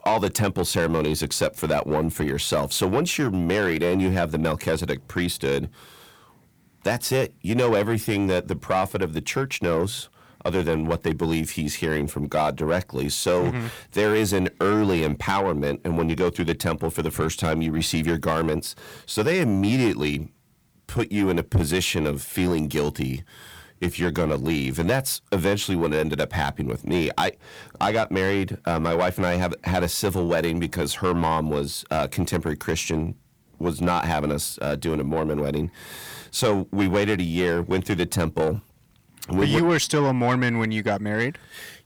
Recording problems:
distortion; slight; 10 dB below the speech

